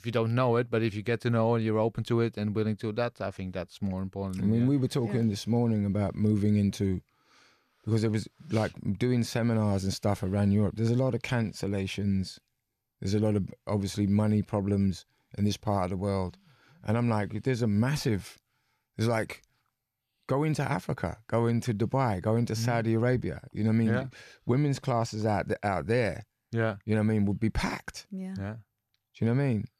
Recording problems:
none

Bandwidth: 14.5 kHz